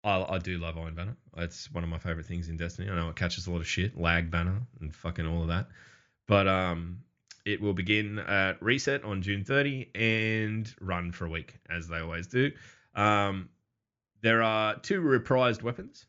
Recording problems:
high frequencies cut off; noticeable; nothing above 7.5 kHz

